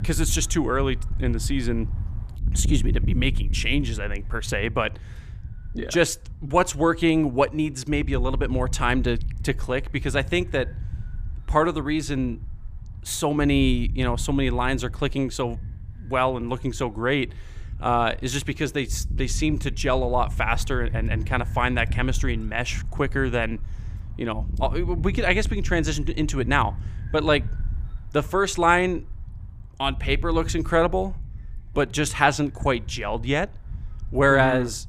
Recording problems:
wind noise on the microphone; occasional gusts; 25 dB below the speech

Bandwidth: 15 kHz